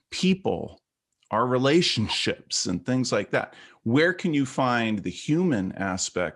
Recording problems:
none

